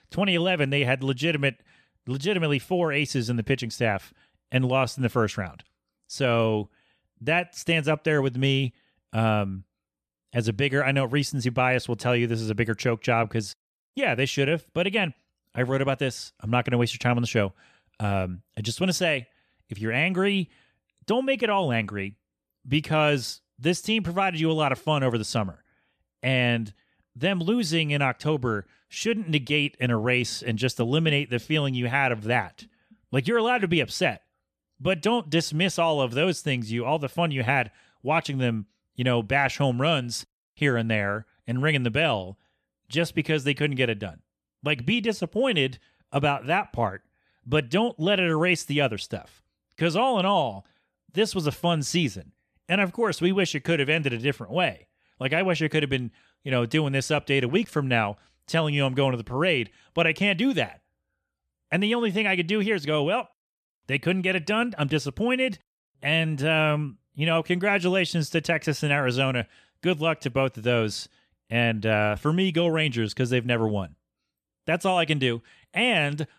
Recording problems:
none

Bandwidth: 14.5 kHz